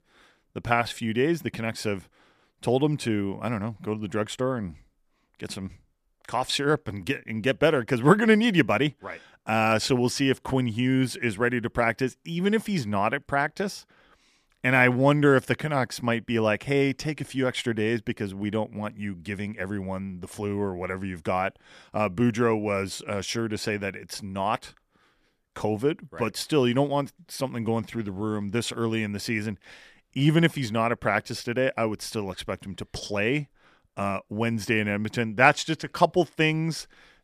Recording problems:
none

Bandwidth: 14.5 kHz